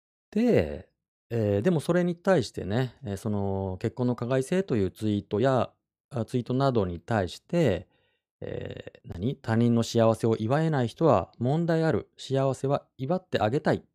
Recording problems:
uneven, jittery; slightly; from 5.5 to 12 s

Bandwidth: 15 kHz